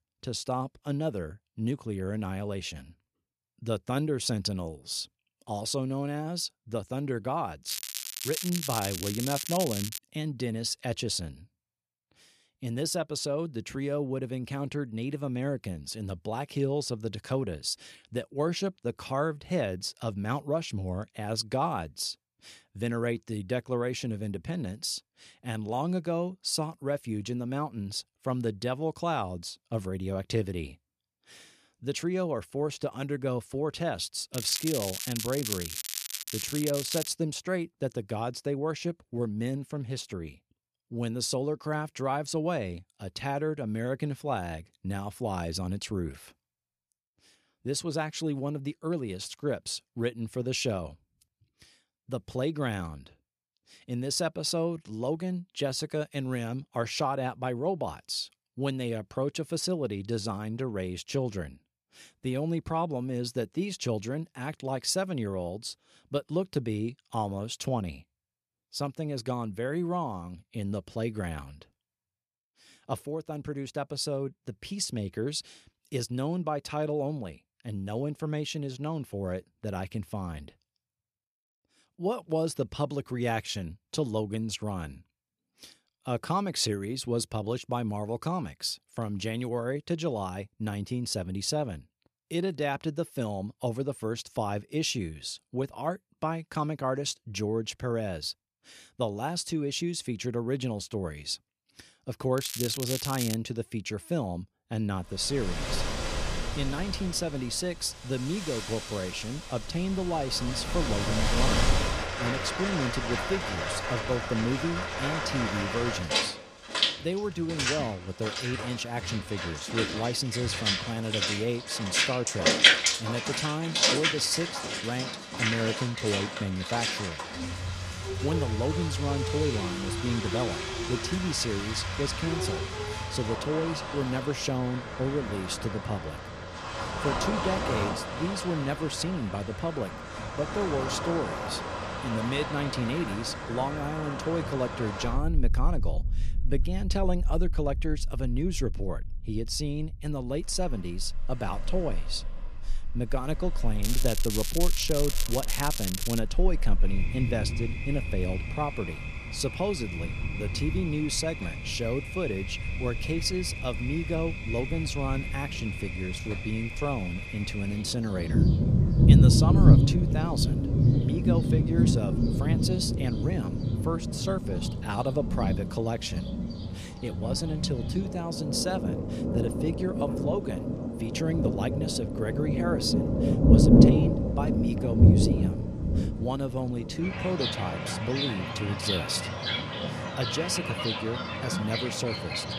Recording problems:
rain or running water; very loud; from 1:46 on; 4 dB above the speech
crackling; loud; 4 times, first at 7.5 s; 2 dB below the speech

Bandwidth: 14.5 kHz